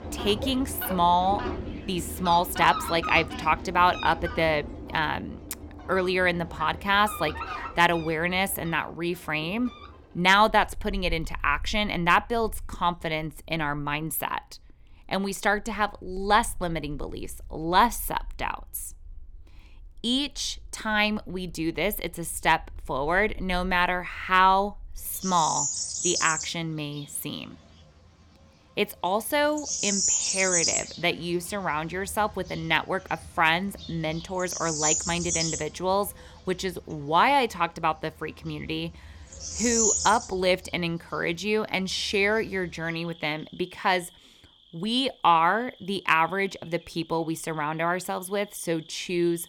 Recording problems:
animal sounds; loud; throughout; 4 dB below the speech

